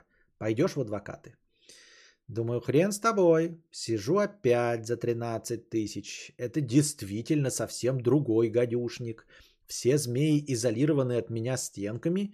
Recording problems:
none

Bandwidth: 14.5 kHz